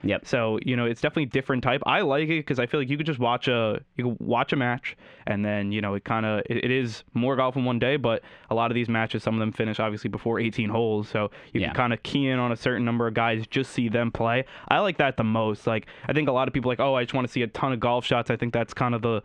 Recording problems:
squashed, flat; heavily
muffled; very slightly; fading above 2.5 kHz

